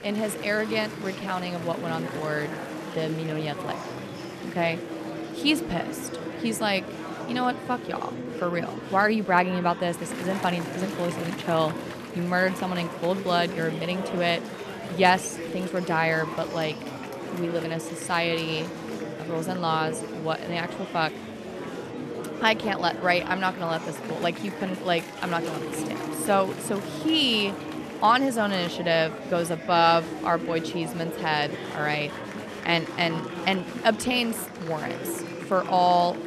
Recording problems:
murmuring crowd; loud; throughout; 8 dB below the speech

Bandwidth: 13.5 kHz